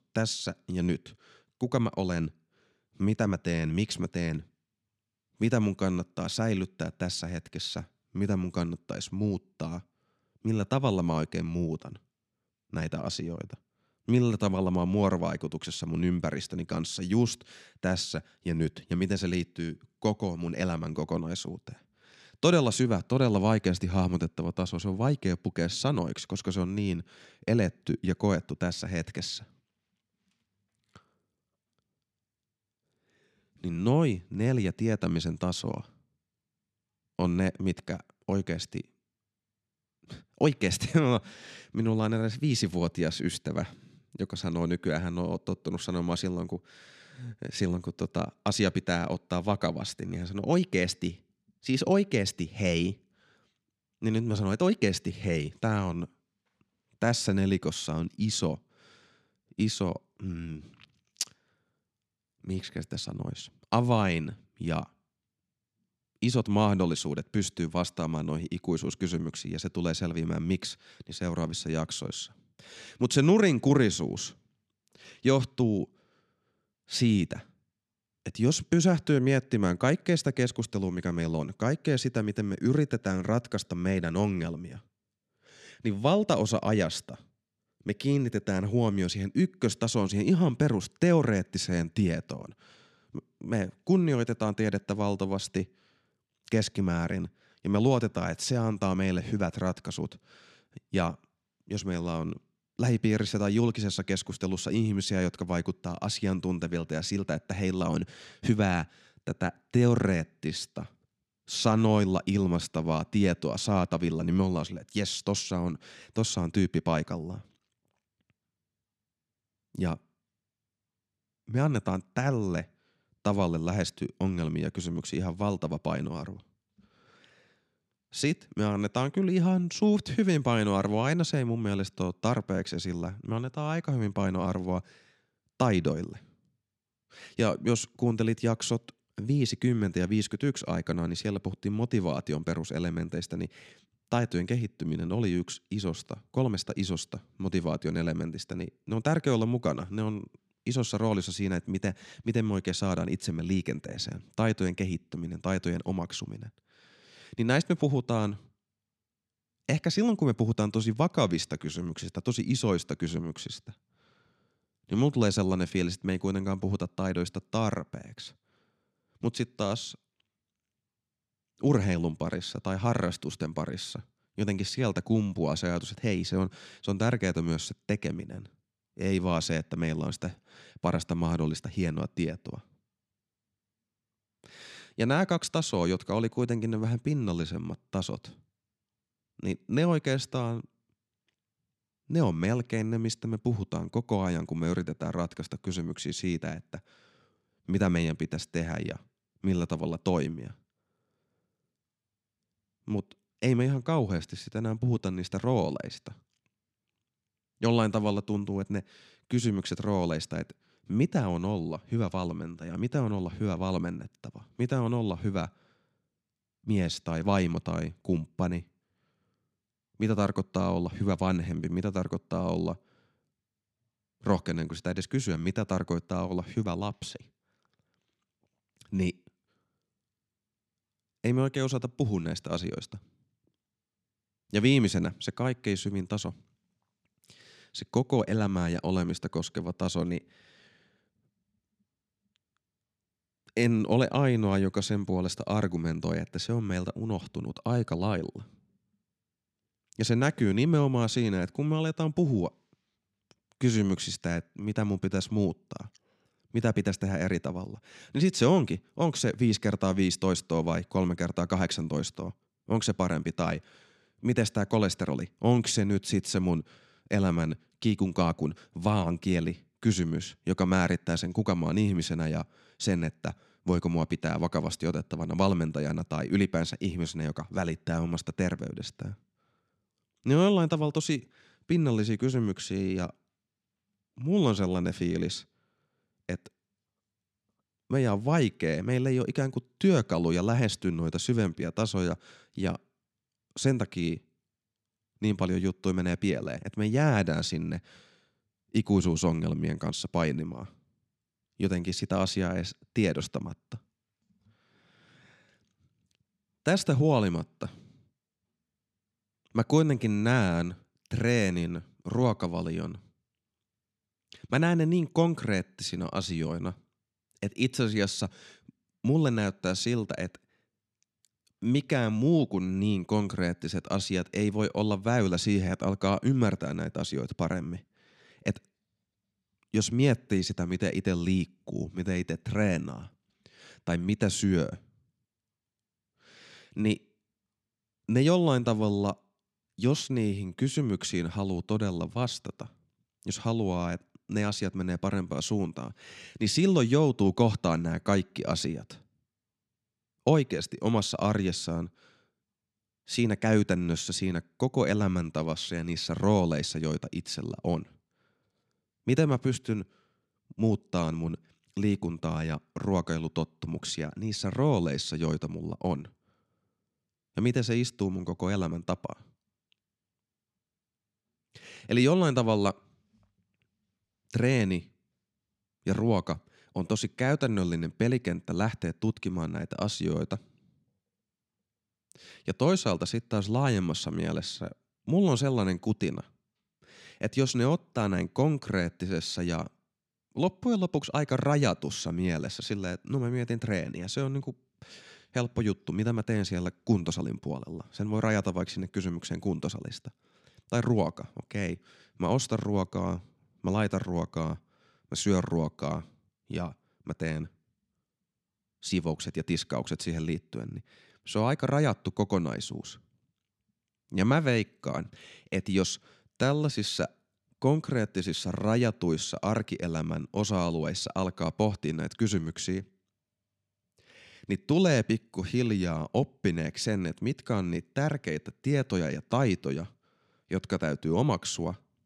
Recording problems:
none

